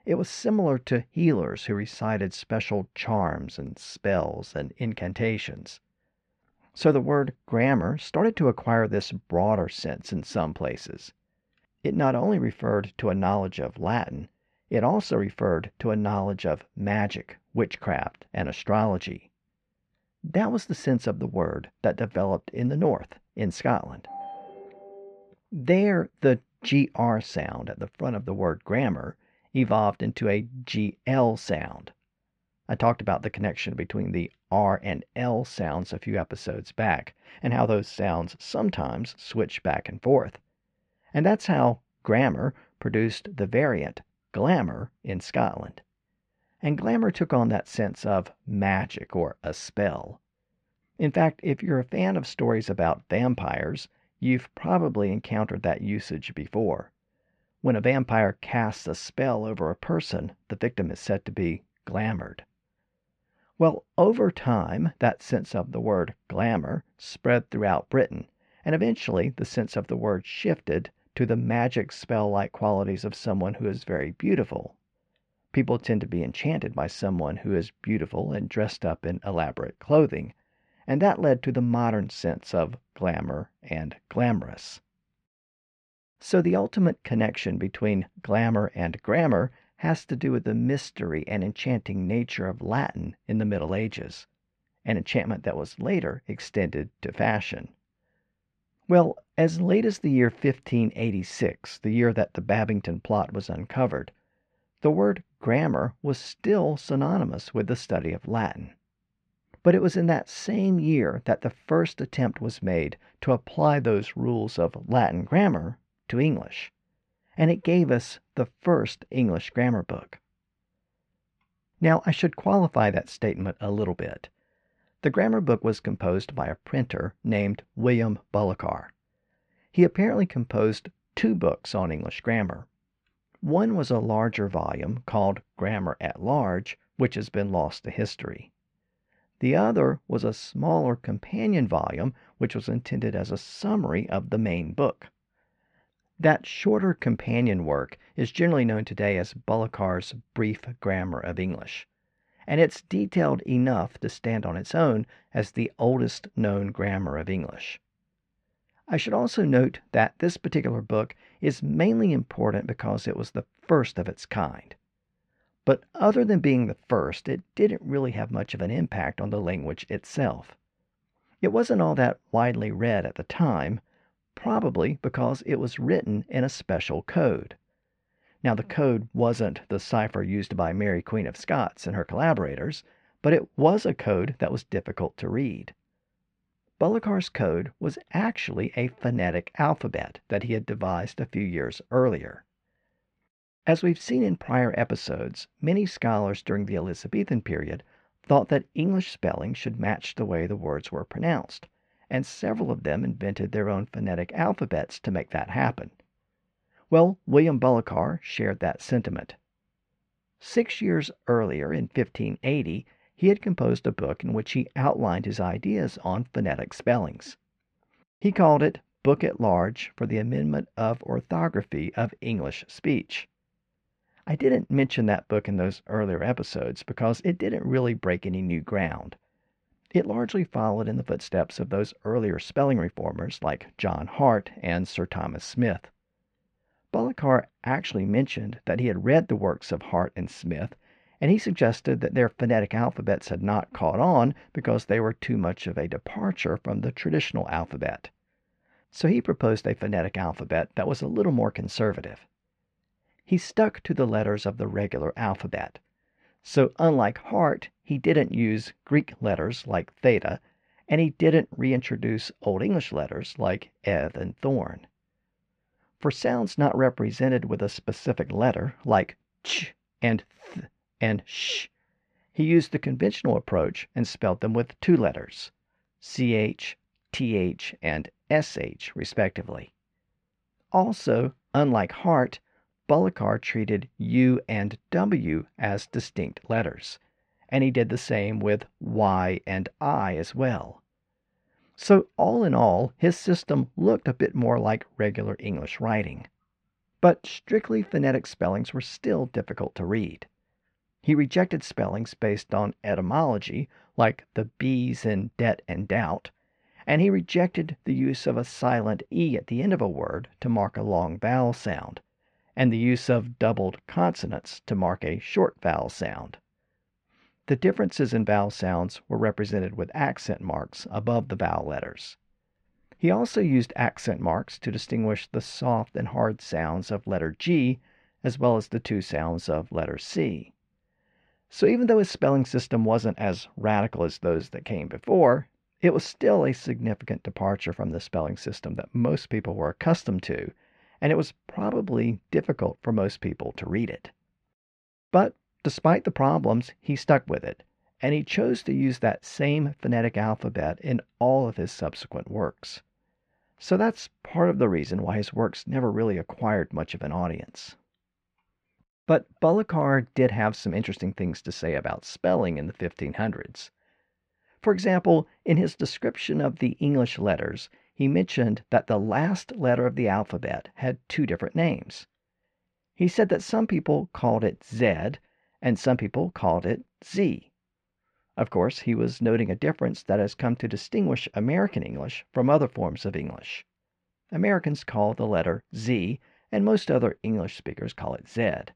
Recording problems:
muffled; slightly; fading above 2.5 kHz
phone ringing; faint; from 24 to 25 s; peak 15 dB below the speech

